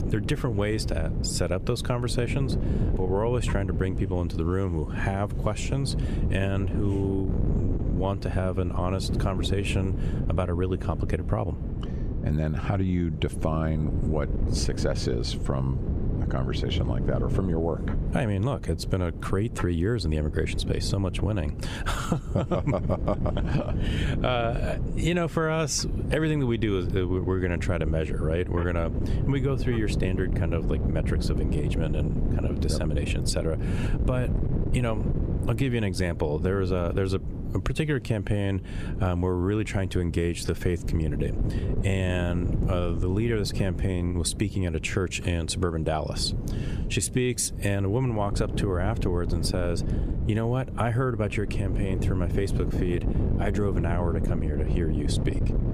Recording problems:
squashed, flat; somewhat
wind noise on the microphone; heavy; 9 dB below the speech

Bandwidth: 14.5 kHz